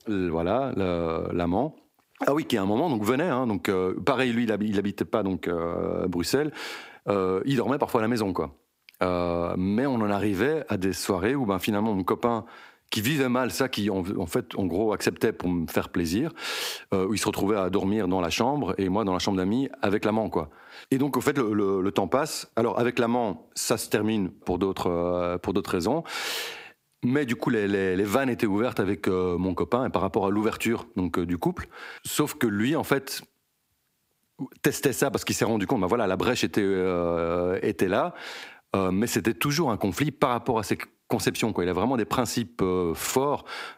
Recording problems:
squashed, flat; heavily

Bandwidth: 15.5 kHz